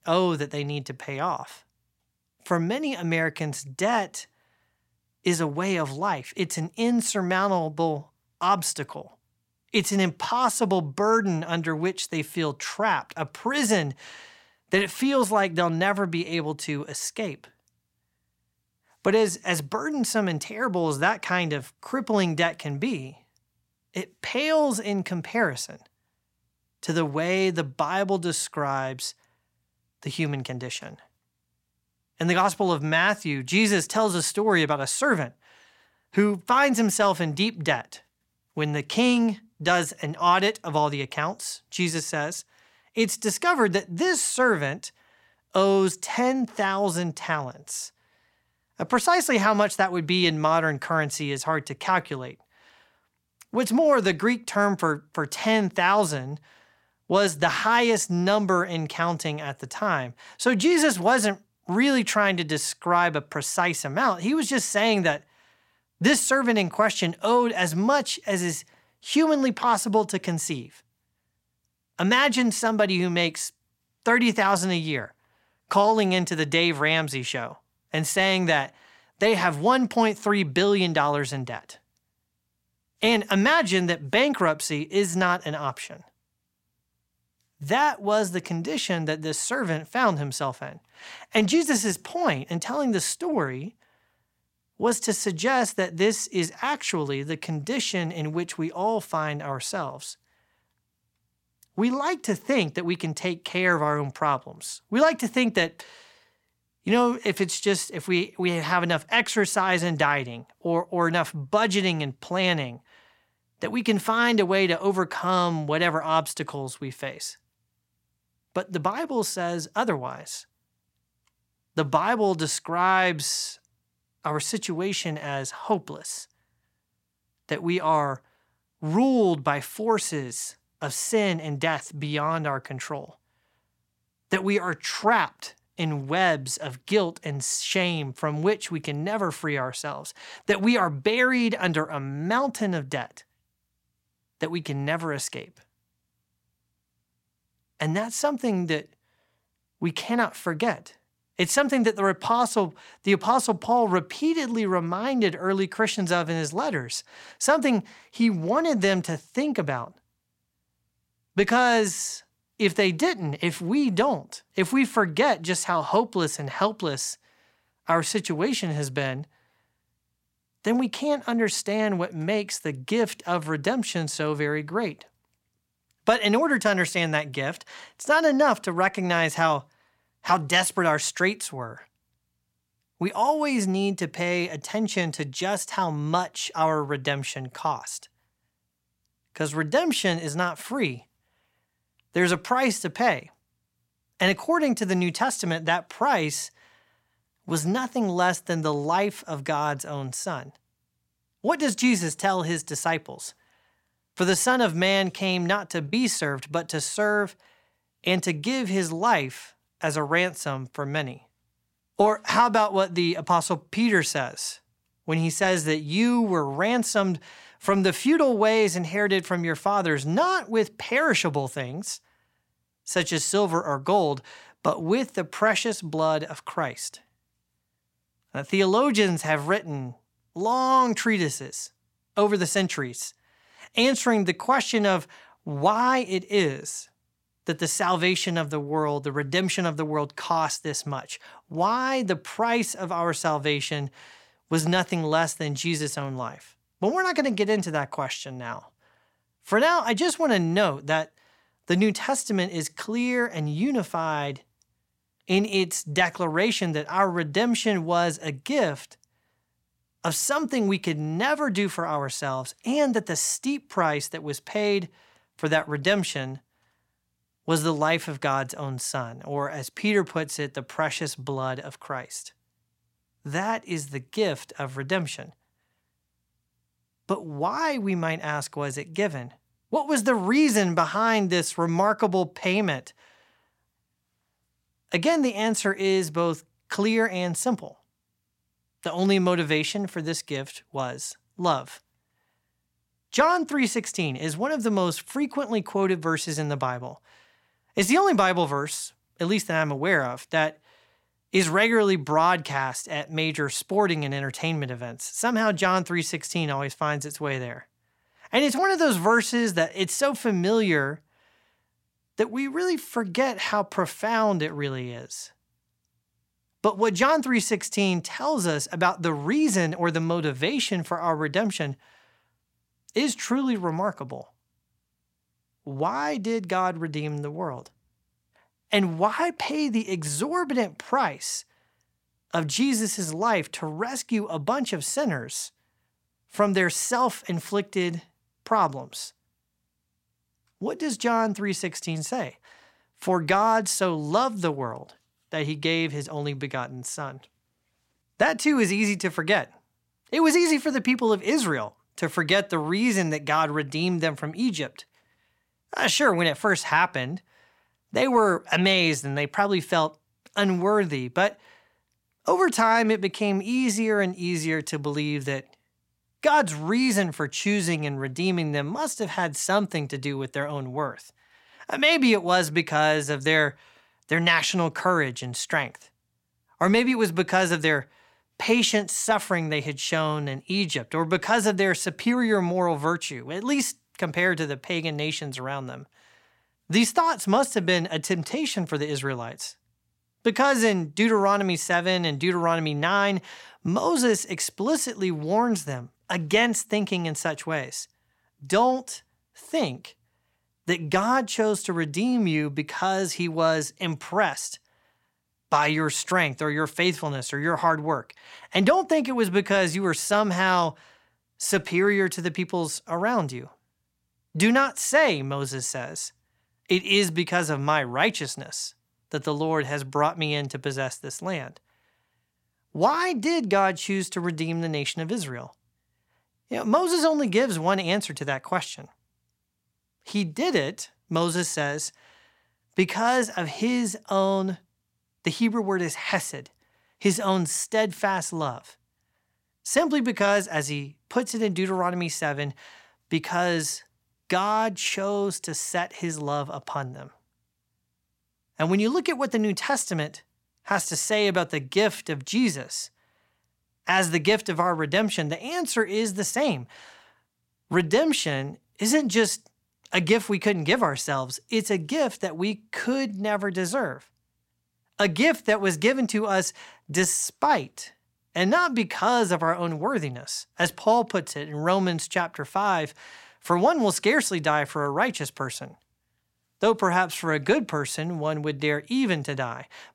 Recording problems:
none

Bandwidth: 16.5 kHz